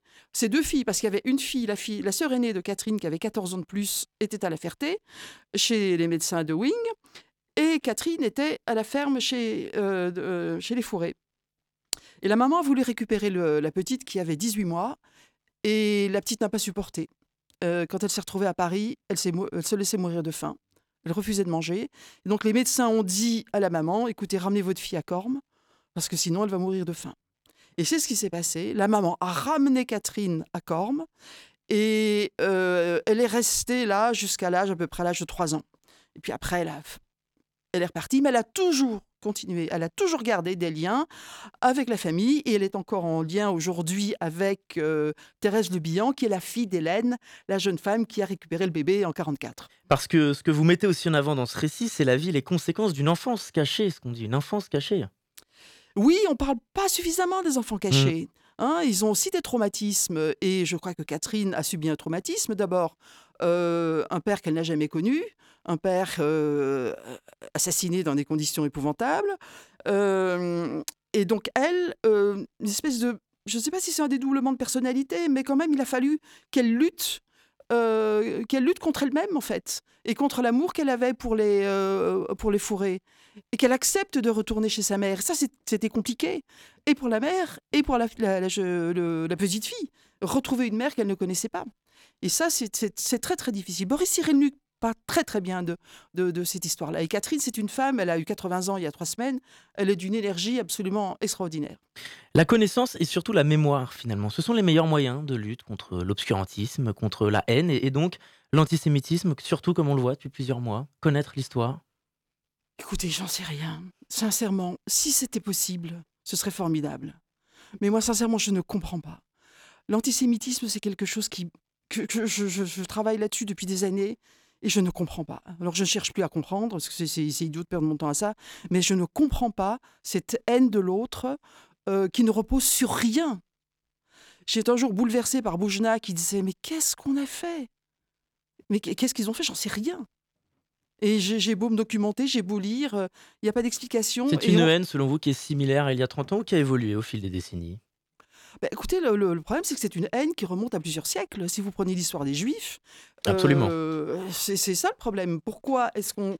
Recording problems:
none

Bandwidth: 17 kHz